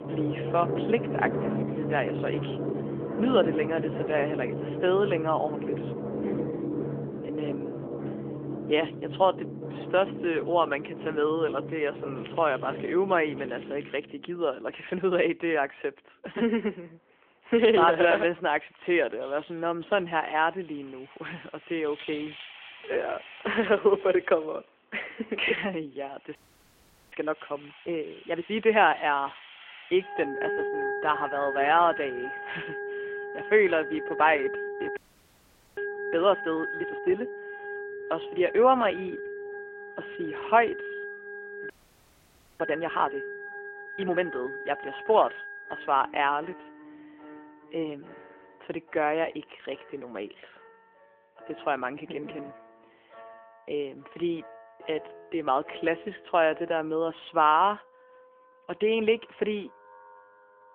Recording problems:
phone-call audio
background music; loud; throughout; 9 dB below the speech
crackling; faint; from 12 to 14 s; 25 dB below the speech
audio freezing; at 26 s for 1 s, at 35 s for 1 s and at 42 s for 1 s

